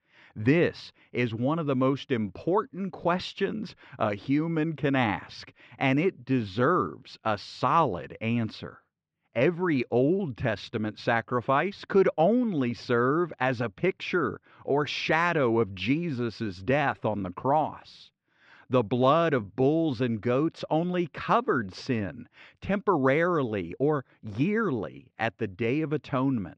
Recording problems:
muffled; slightly; fading above 3.5 kHz

